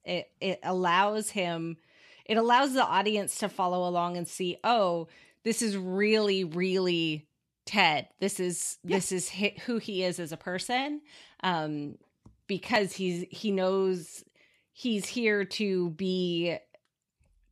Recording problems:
none

